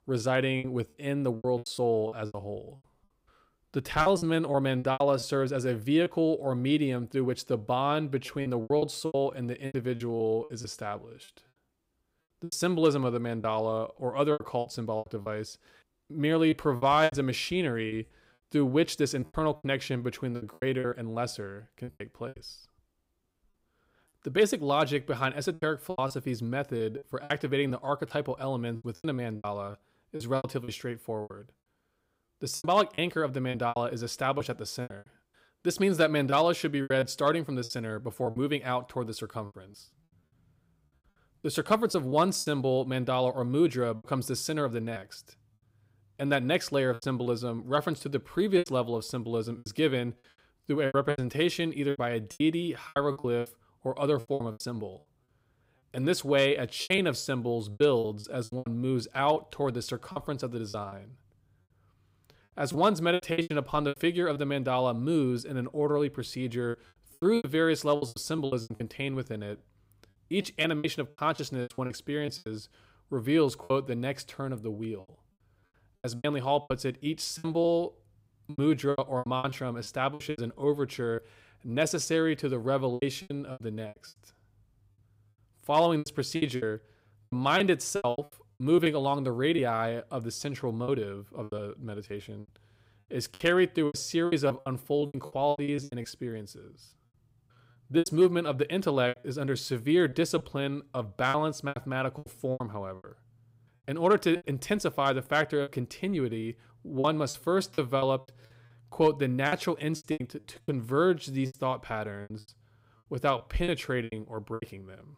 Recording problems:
choppy; very; 13% of the speech affected

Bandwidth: 15.5 kHz